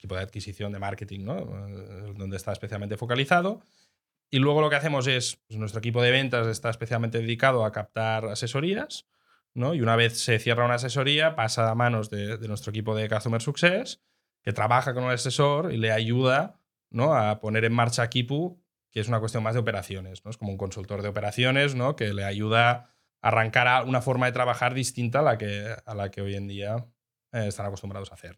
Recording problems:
none

